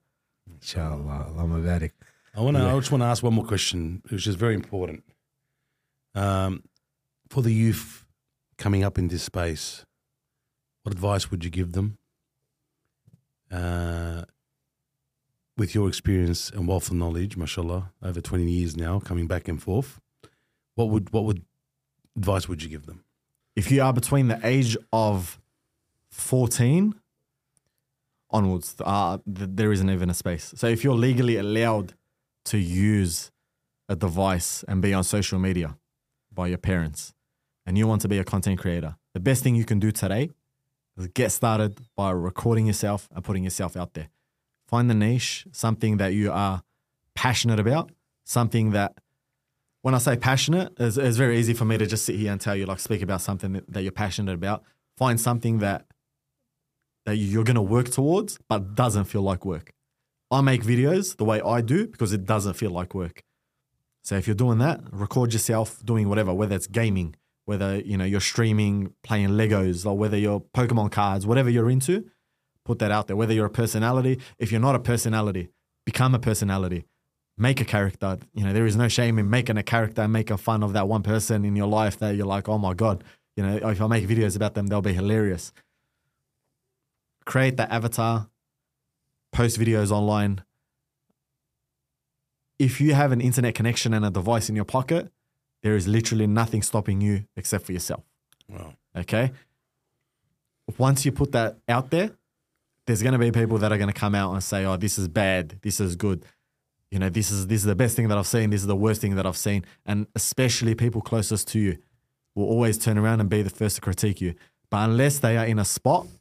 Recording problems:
none

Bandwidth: 15 kHz